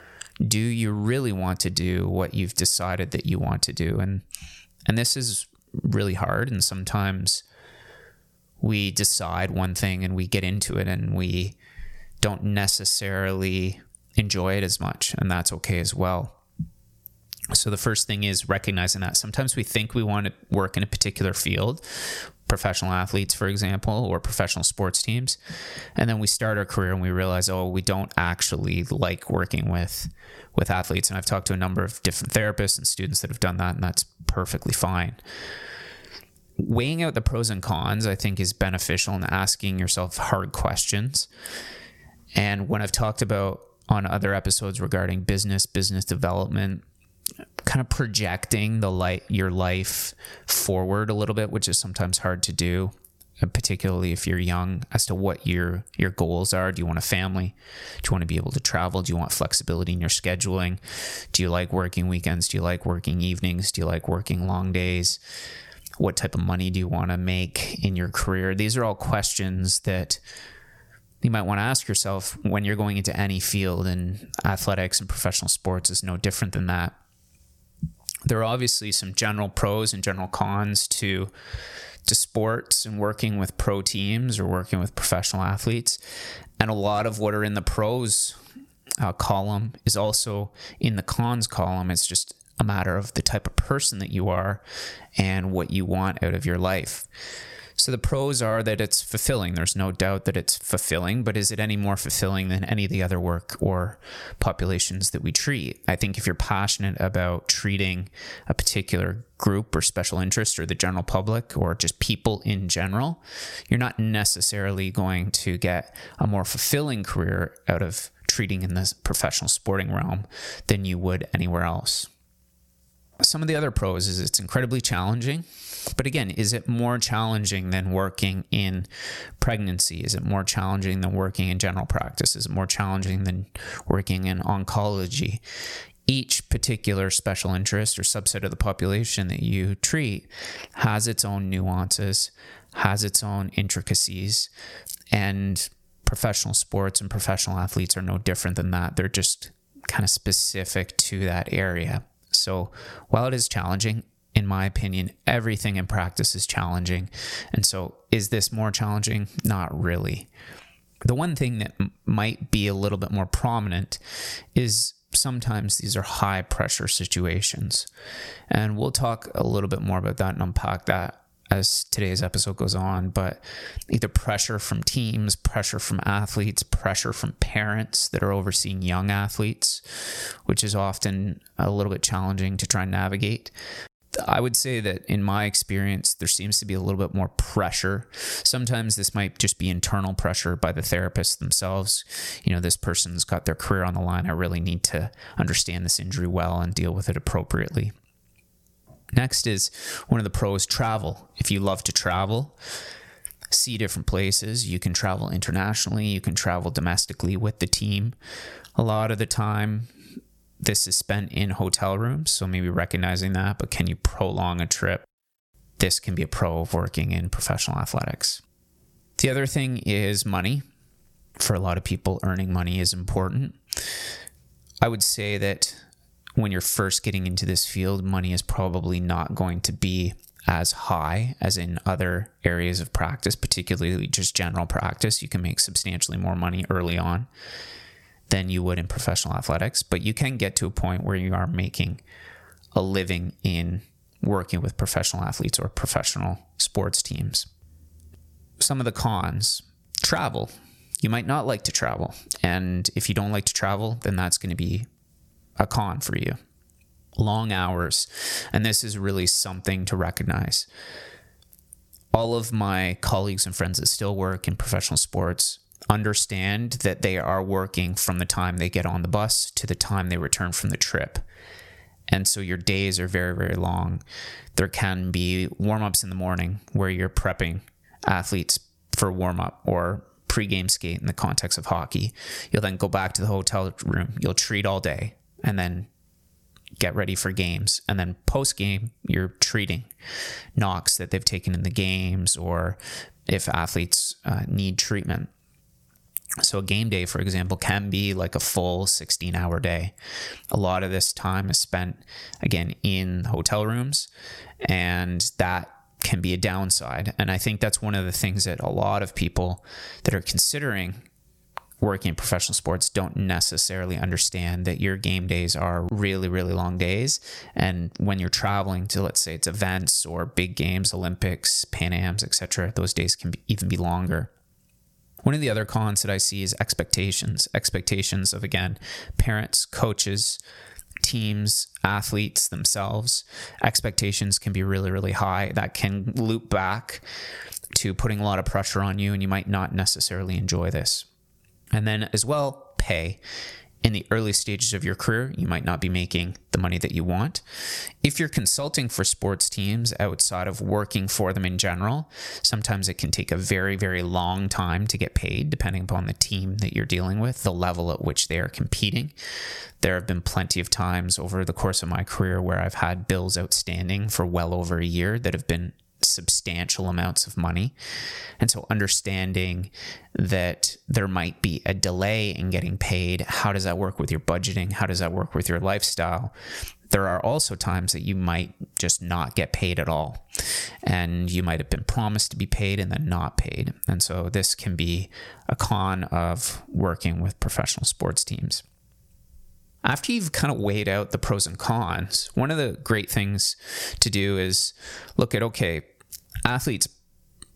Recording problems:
squashed, flat; somewhat

